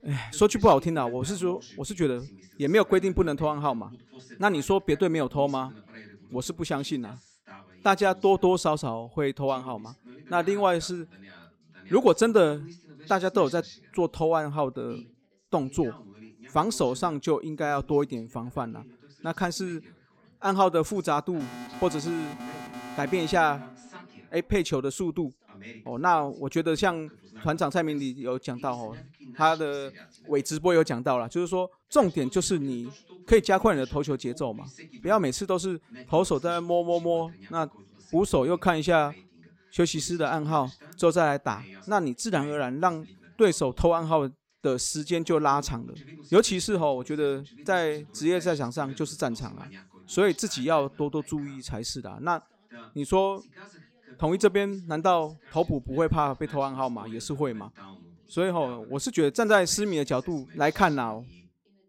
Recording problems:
background chatter; faint; throughout; 2 voices, 25 dB below the speech
alarm; faint; from 21 to 24 s; peak 15 dB below the speech

